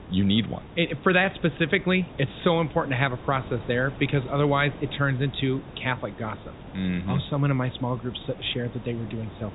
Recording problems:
high frequencies cut off; severe; nothing above 4 kHz
hiss; noticeable; throughout; 15 dB below the speech

